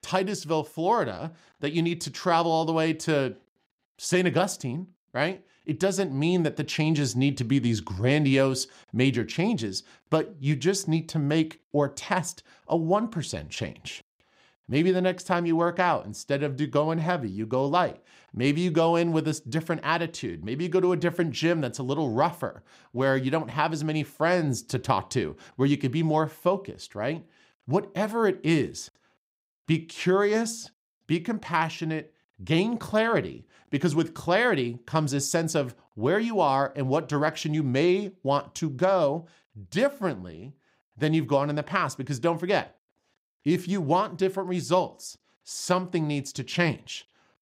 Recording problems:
none

